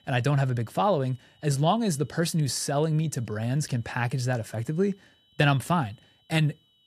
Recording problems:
high-pitched whine; faint; throughout; 3 kHz, 35 dB below the speech

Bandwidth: 14.5 kHz